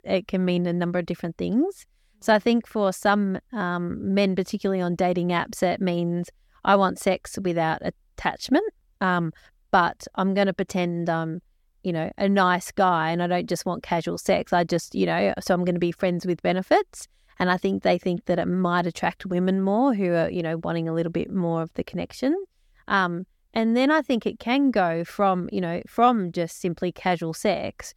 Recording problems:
none

